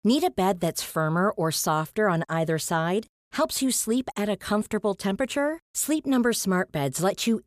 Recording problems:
none

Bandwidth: 14.5 kHz